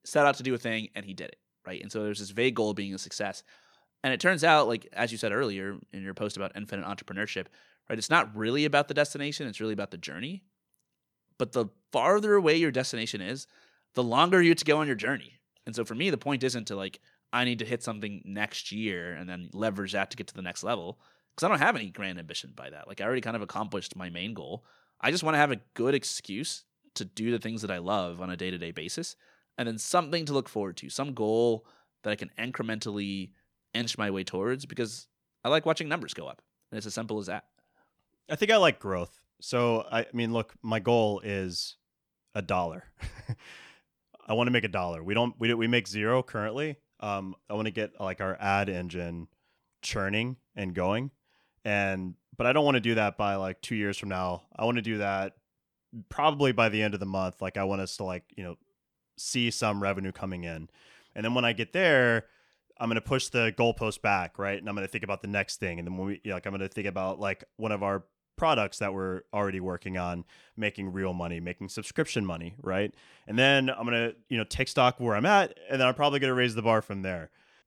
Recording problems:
none

